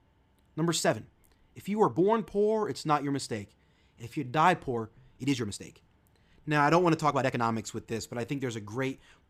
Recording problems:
uneven, jittery; strongly; from 1 to 8.5 s

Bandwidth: 15 kHz